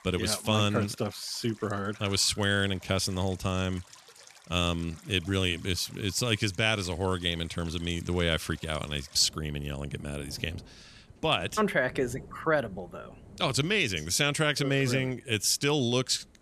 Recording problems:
rain or running water; faint; throughout; 25 dB below the speech

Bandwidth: 13.5 kHz